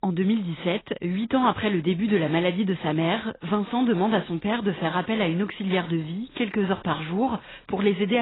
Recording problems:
garbled, watery; badly; nothing above 4 kHz
abrupt cut into speech; at the end

